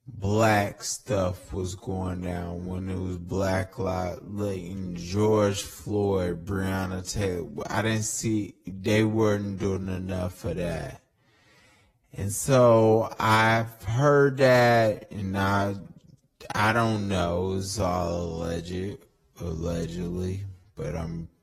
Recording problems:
wrong speed, natural pitch; too slow; 0.5 times normal speed
garbled, watery; slightly; nothing above 13 kHz

